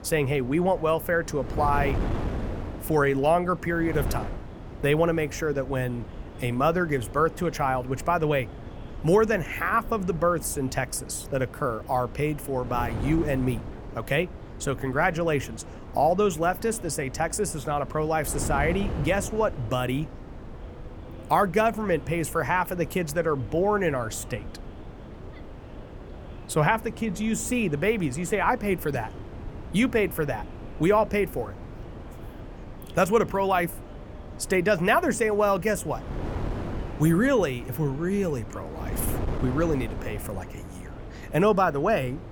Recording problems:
wind noise on the microphone; occasional gusts; 15 dB below the speech
murmuring crowd; faint; throughout; 25 dB below the speech

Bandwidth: 18 kHz